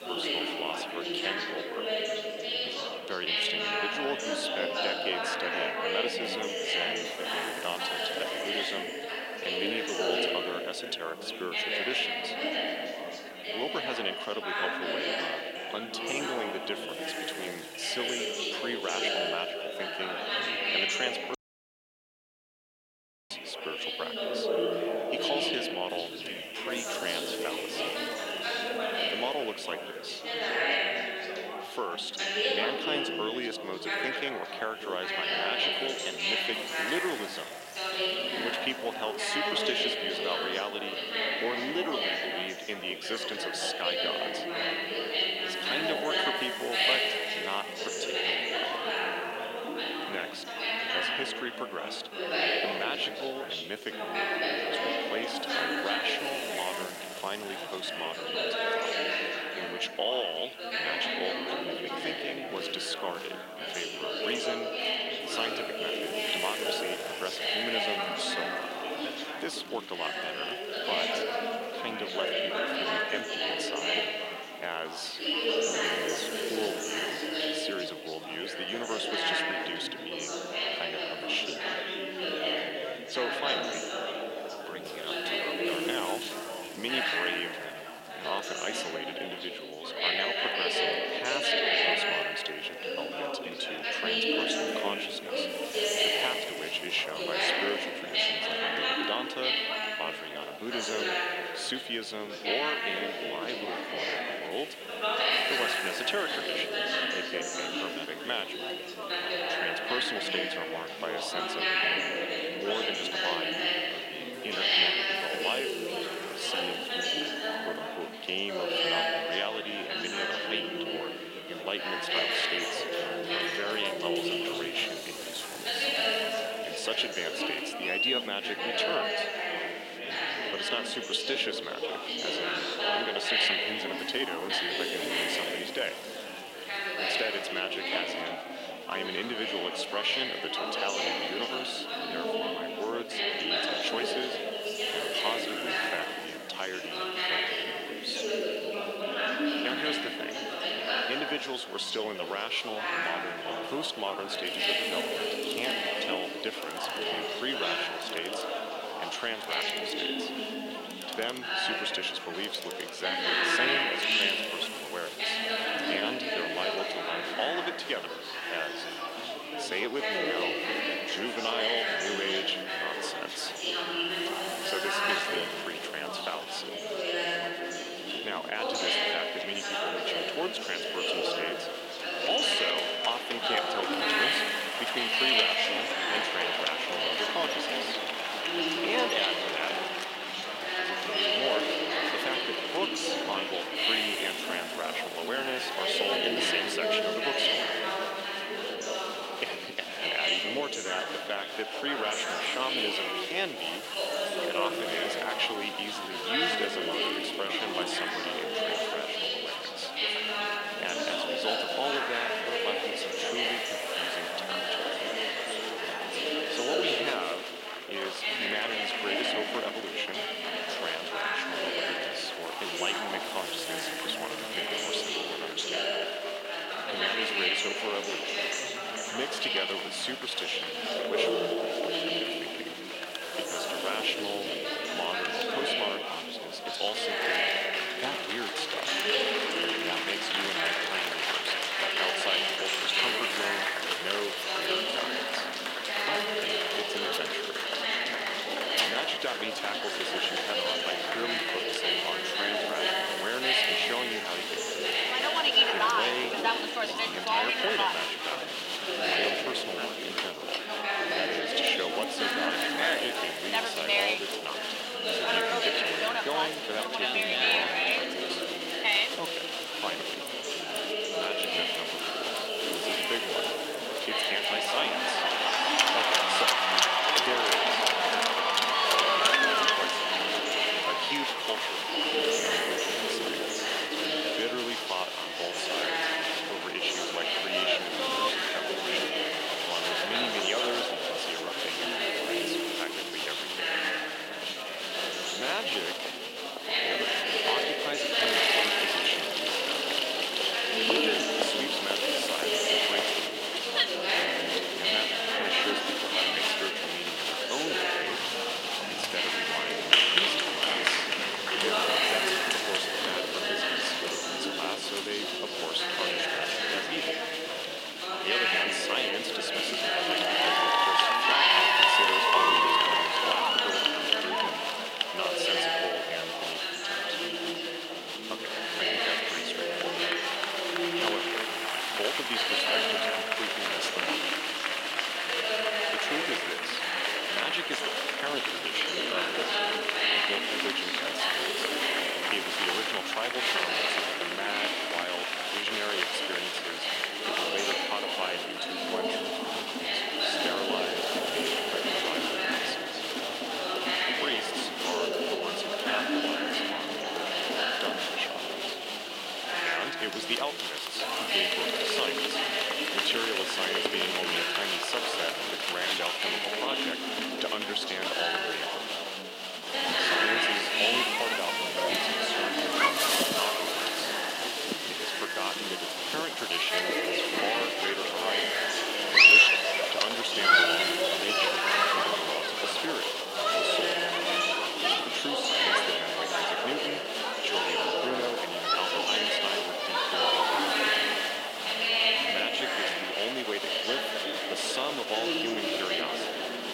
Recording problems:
thin; somewhat; fading below 450 Hz
chatter from many people; very loud; throughout; 7 dB above the speech
household noises; loud; throughout; 7 dB below the speech
hiss; noticeable; throughout; 15 dB below the speech
audio cutting out; at 21 s for 2 s

